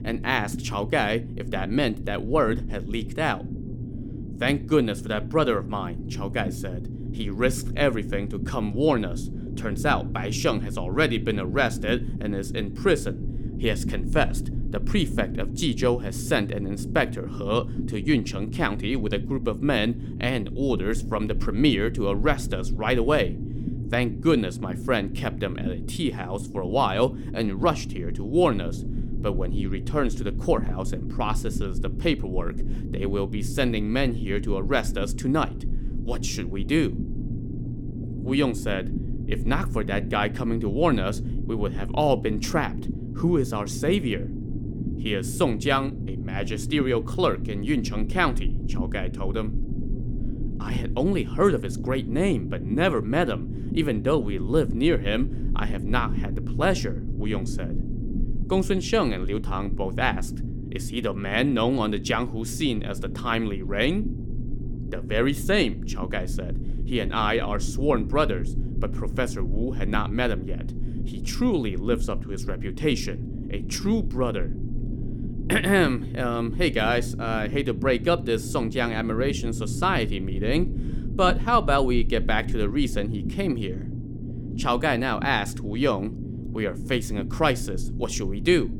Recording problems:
low rumble; noticeable; throughout; 15 dB below the speech

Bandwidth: 17.5 kHz